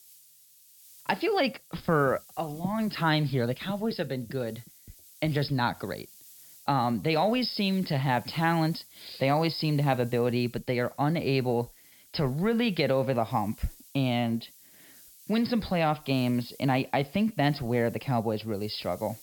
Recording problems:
high frequencies cut off; noticeable; nothing above 5.5 kHz
hiss; faint; throughout; 25 dB below the speech

